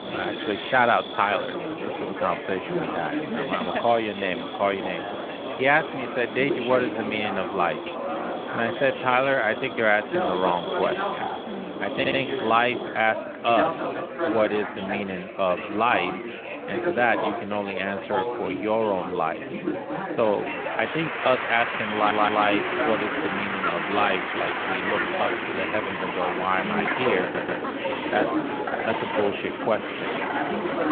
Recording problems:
phone-call audio; nothing above 3.5 kHz
animal sounds; loud; throughout; 8 dB below the speech
chatter from many people; loud; throughout; 4 dB below the speech
audio stuttering; at 12 s, at 22 s and at 27 s

